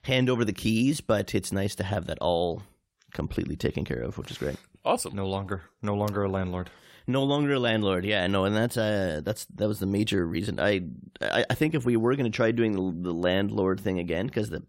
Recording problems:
none

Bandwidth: 16 kHz